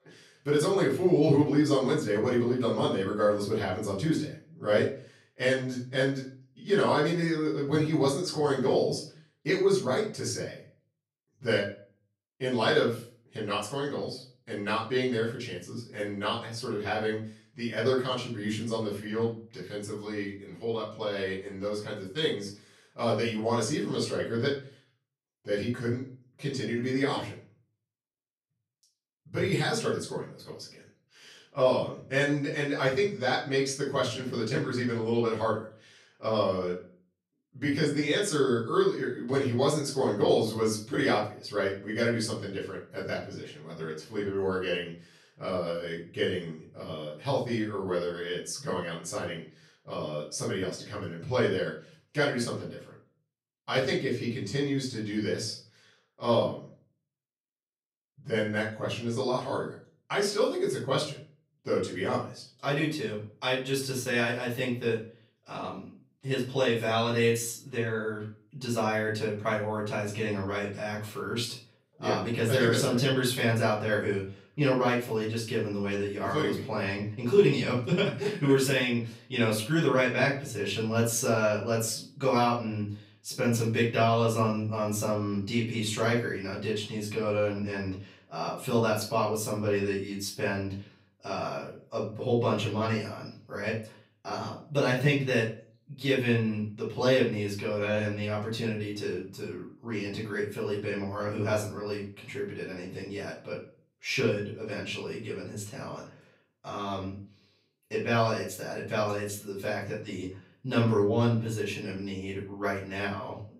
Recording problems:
off-mic speech; far
room echo; slight; dies away in 0.4 s

